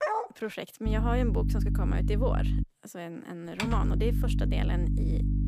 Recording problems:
electrical hum; loud; from 1 to 2.5 s and from 3.5 s on; 50 Hz, 5 dB below the speech
dog barking; loud; at the start; peak 5 dB above the speech
keyboard typing; loud; at 3.5 s; peak 1 dB above the speech

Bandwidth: 15 kHz